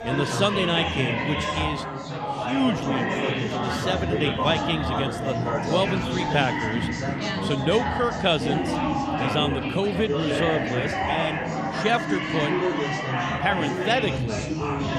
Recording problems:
chatter from many people; very loud; throughout; as loud as the speech

